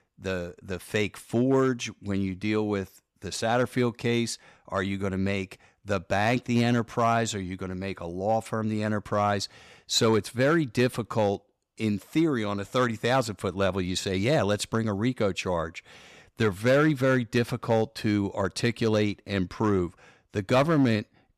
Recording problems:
none

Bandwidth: 15 kHz